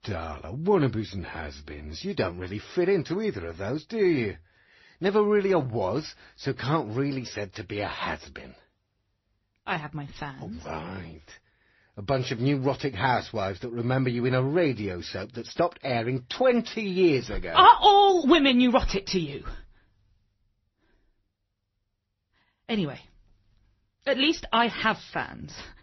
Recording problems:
garbled, watery; slightly; nothing above 6 kHz

